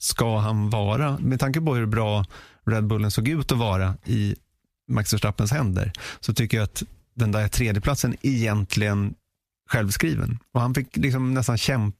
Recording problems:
squashed, flat; somewhat

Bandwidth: 14.5 kHz